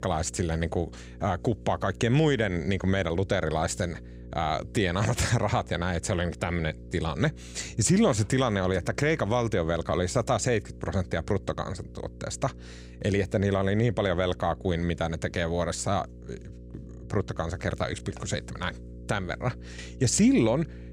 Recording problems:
electrical hum; faint; throughout; 60 Hz, 25 dB below the speech

